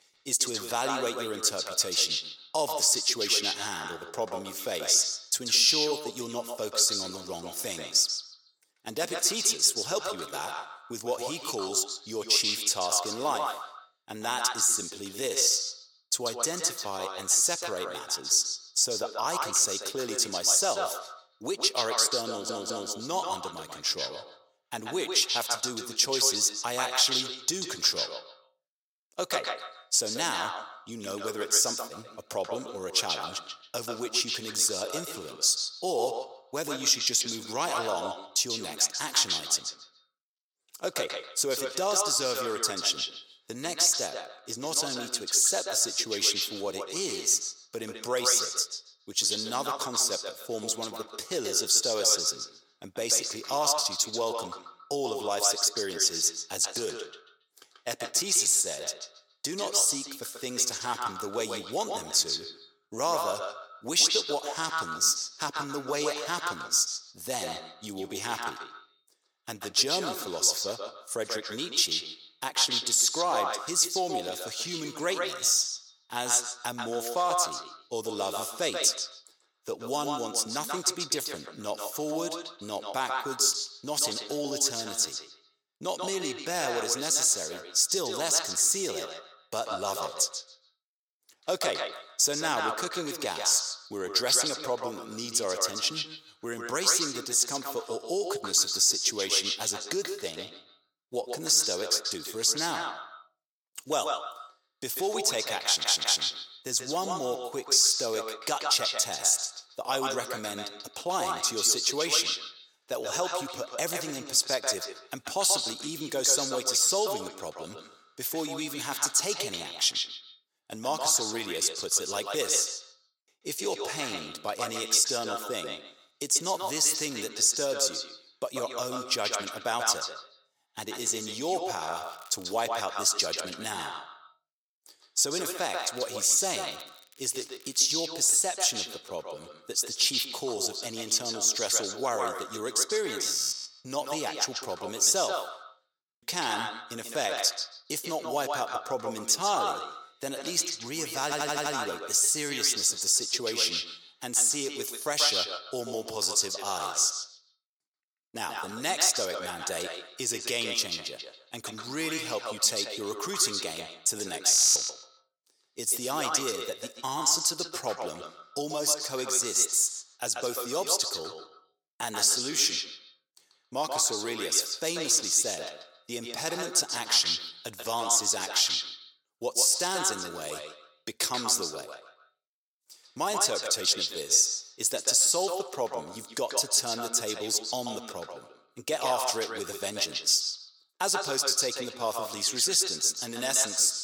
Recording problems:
echo of what is said; strong; throughout; 140 ms later, 8 dB below the speech
thin; very; fading below 500 Hz
crackling; faint; at 2:12 and from 2:15 to 2:18; 25 dB below the speech
audio stuttering; at 22 s, at 1:46 and at 2:31
audio freezing; at 2:23, at 2:26 and at 2:45

